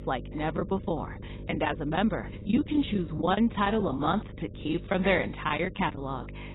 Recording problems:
garbled, watery; badly; nothing above 4 kHz
muffled; very slightly; fading above 4 kHz
electrical hum; faint; throughout; 50 Hz, 20 dB below the speech
choppy; very; 12% of the speech affected

